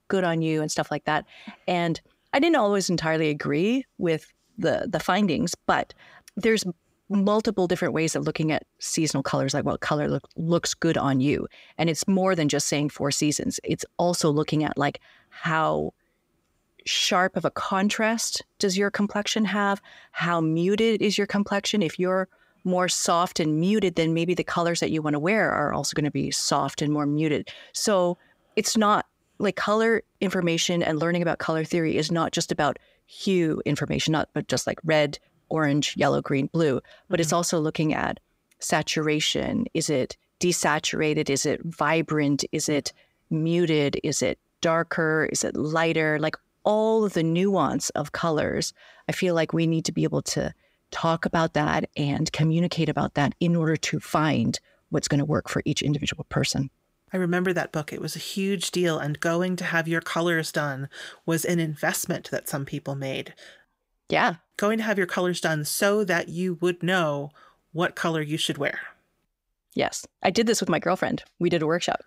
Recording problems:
none

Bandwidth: 15.5 kHz